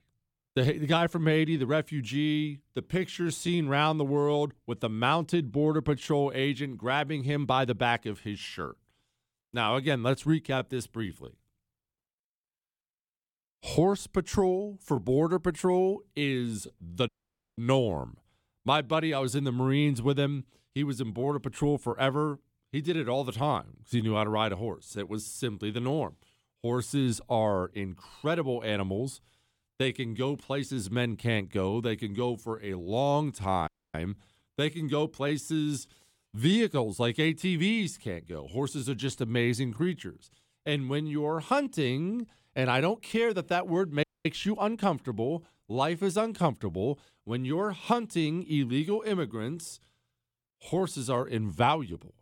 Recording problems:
audio cutting out; at 17 s, at 34 s and at 44 s

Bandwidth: 18.5 kHz